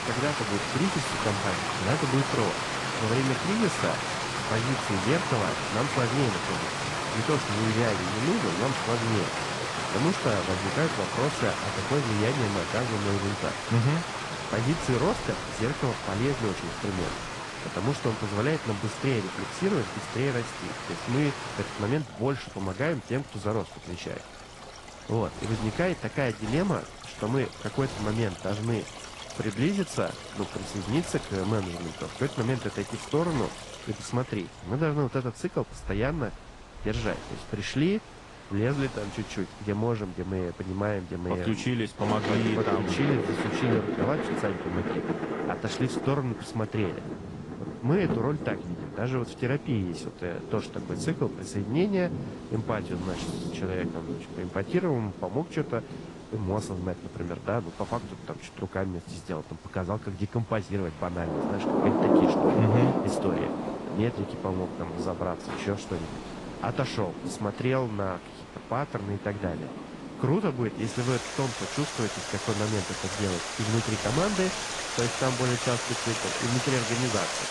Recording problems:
garbled, watery; slightly; nothing above 10.5 kHz
rain or running water; loud; throughout; 2 dB below the speech
wind noise on the microphone; occasional gusts; 15 dB below the speech

